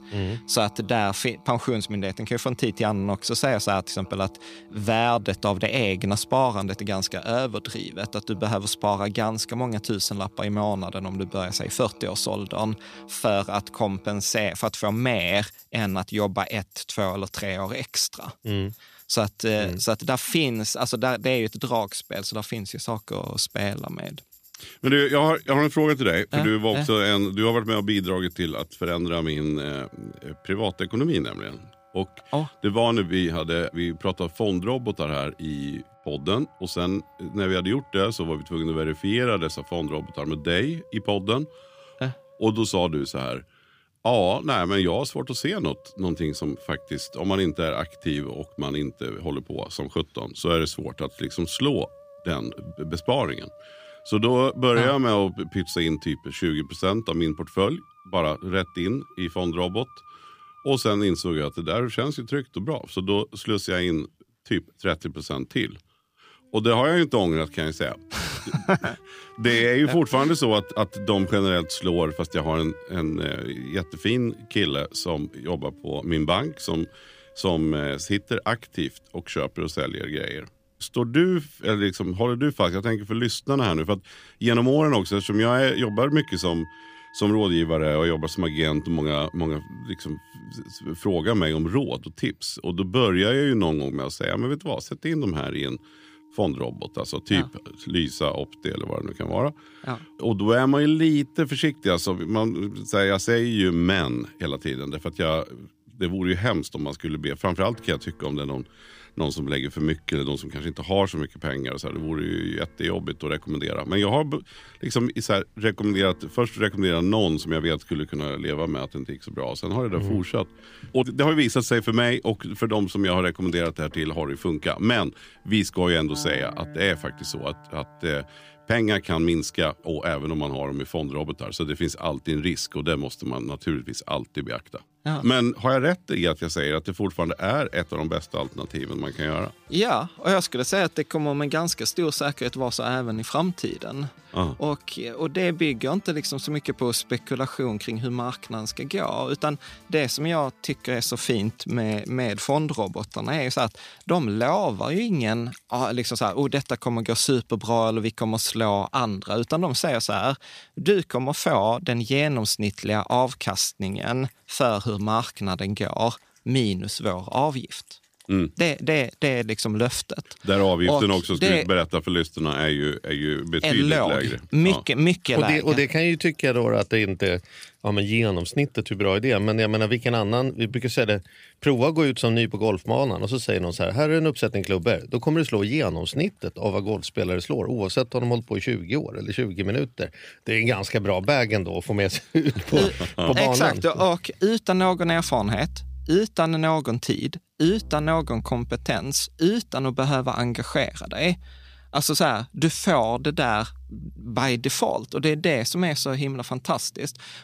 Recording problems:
background music; faint; throughout; 25 dB below the speech

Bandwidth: 15 kHz